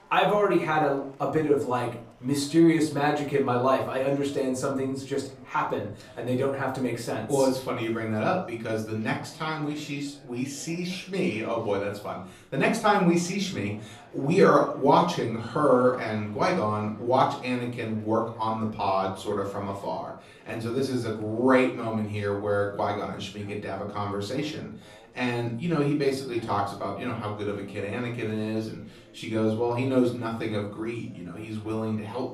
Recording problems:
off-mic speech; far
room echo; slight; dies away in 0.4 s
chatter from many people; faint; throughout; 25 dB below the speech

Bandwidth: 15 kHz